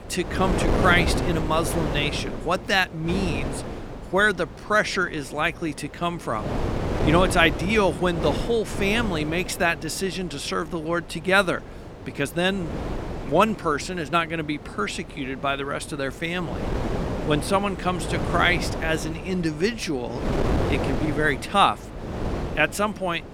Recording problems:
wind noise on the microphone; heavy; 9 dB below the speech

